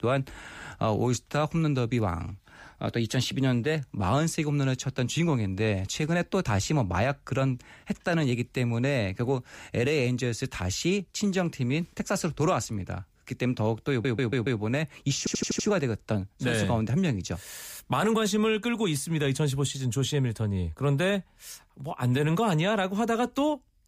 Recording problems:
audio stuttering; at 14 s and at 15 s

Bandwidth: 15 kHz